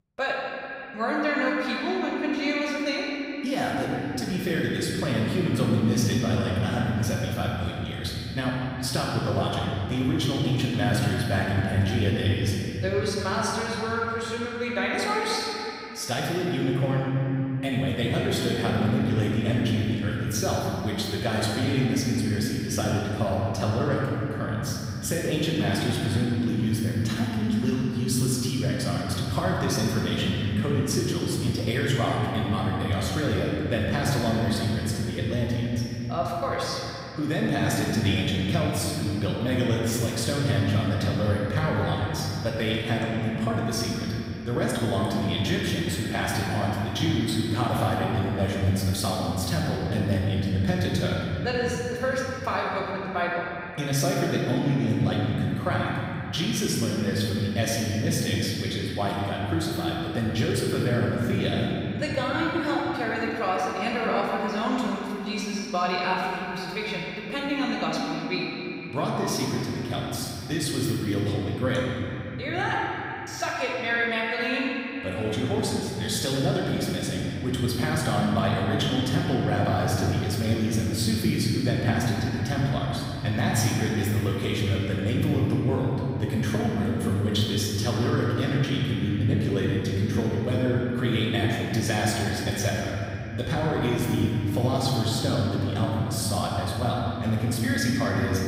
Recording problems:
room echo; strong; dies away in 3 s
off-mic speech; far

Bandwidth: 15.5 kHz